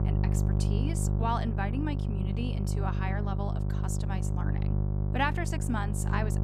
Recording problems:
electrical hum; loud; throughout; 50 Hz, 6 dB below the speech

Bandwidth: 15.5 kHz